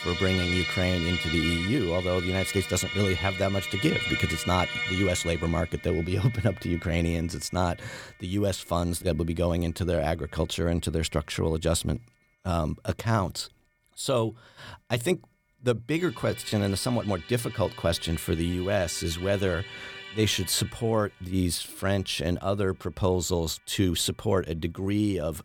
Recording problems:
background music; loud; throughout; 5 dB below the speech

